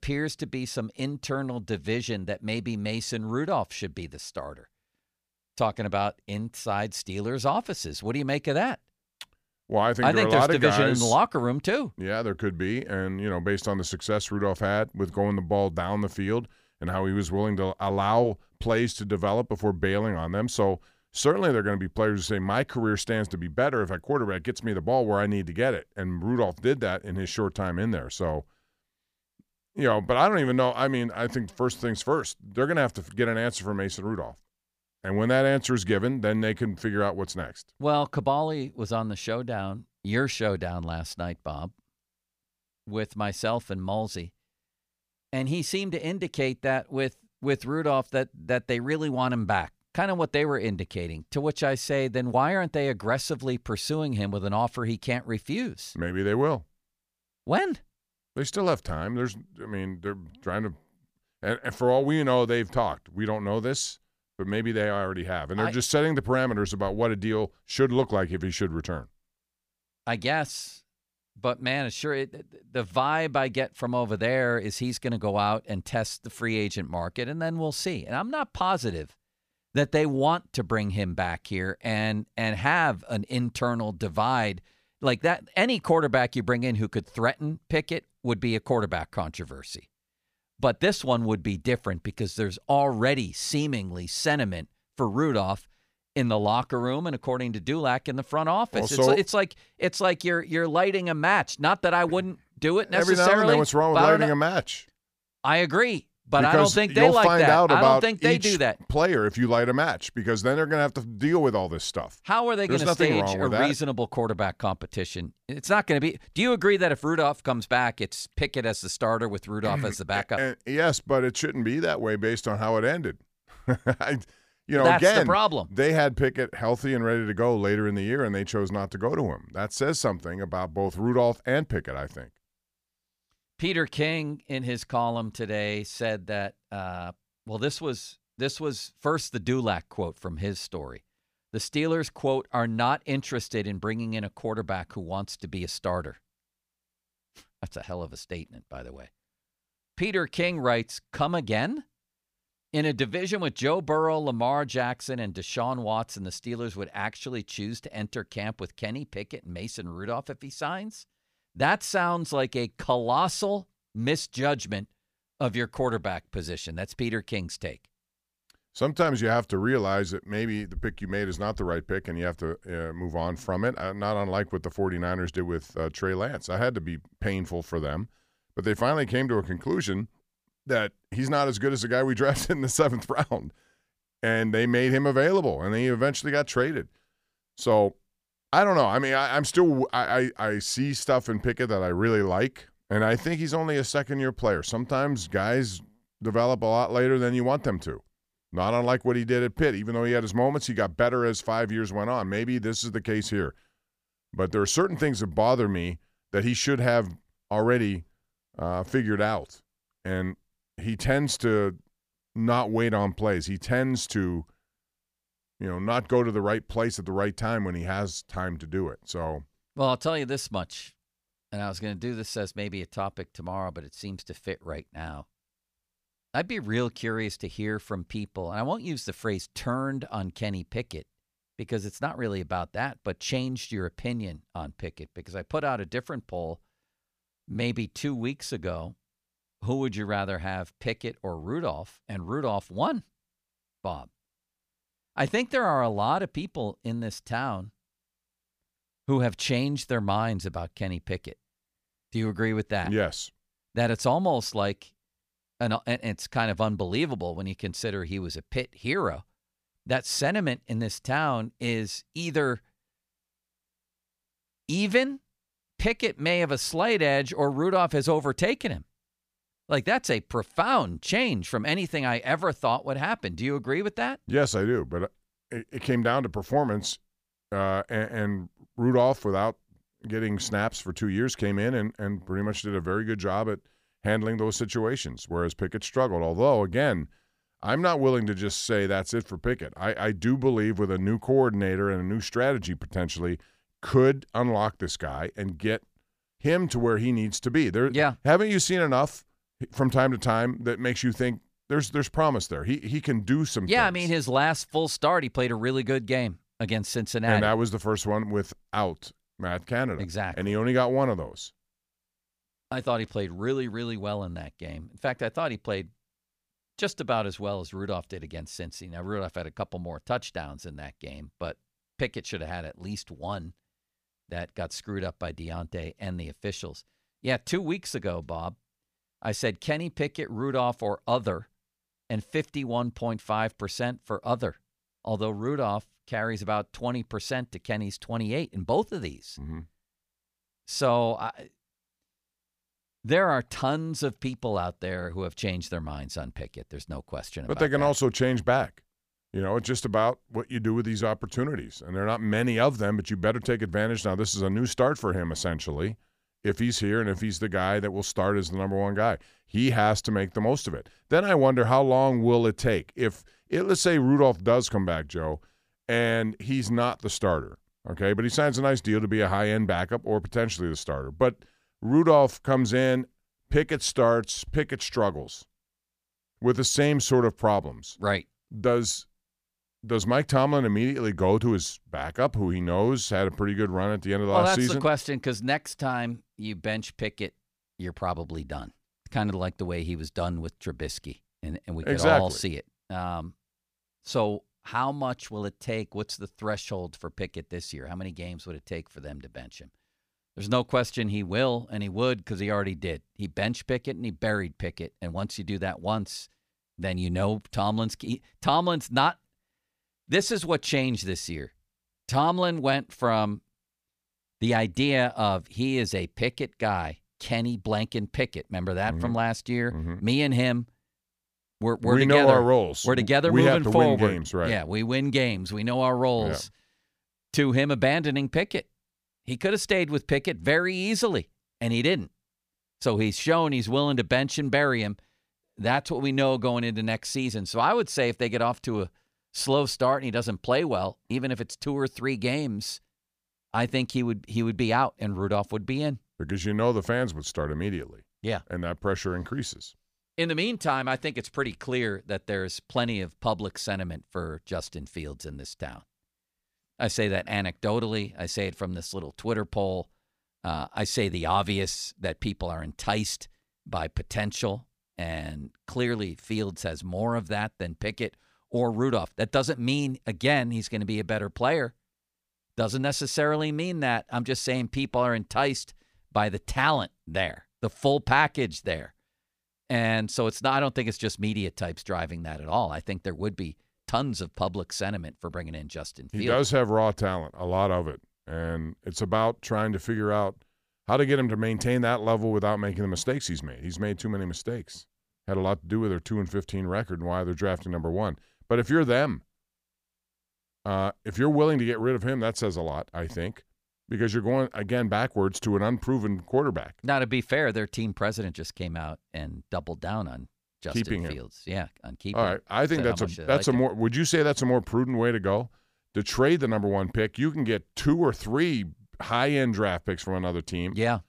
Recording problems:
none

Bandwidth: 15 kHz